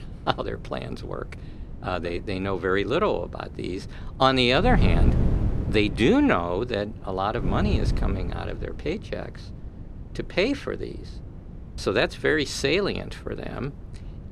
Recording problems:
wind noise on the microphone; occasional gusts; 15 dB below the speech

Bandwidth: 14 kHz